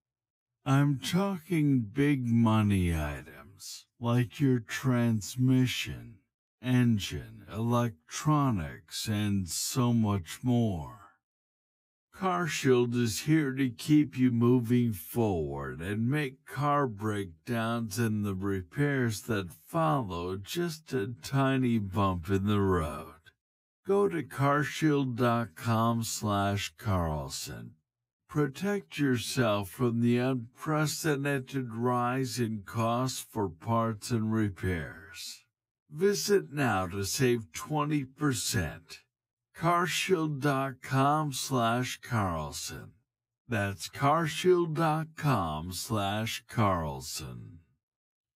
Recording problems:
wrong speed, natural pitch; too slow; 0.5 times normal speed

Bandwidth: 15.5 kHz